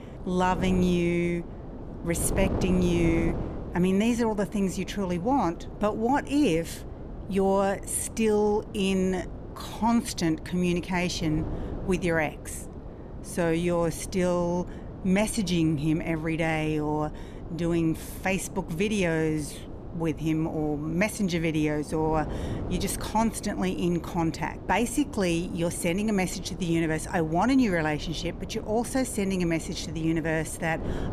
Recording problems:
wind noise on the microphone; occasional gusts; 15 dB below the speech

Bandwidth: 14.5 kHz